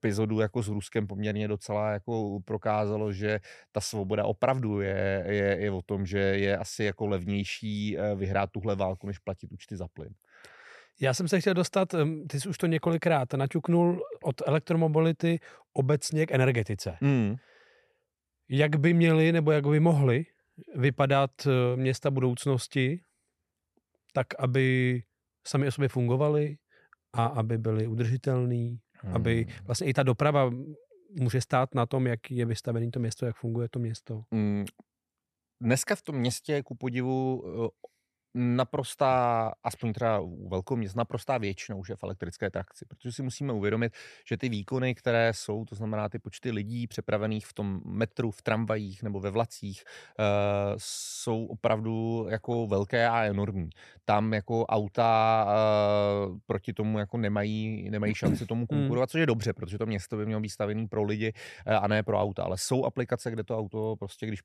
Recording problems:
none

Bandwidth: 13.5 kHz